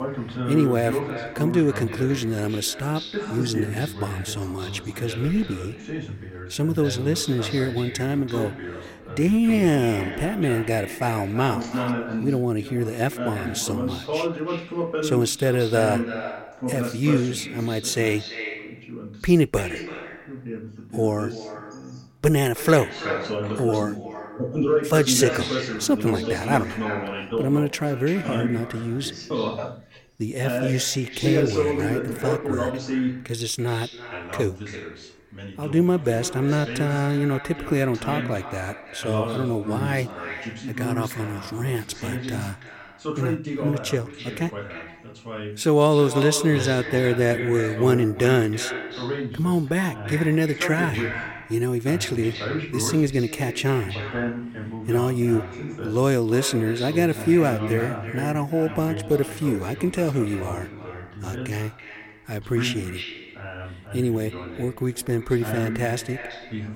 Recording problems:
echo of what is said; strong; throughout; 330 ms later, 10 dB below the speech
voice in the background; loud; throughout; 7 dB below the speech

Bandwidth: 16.5 kHz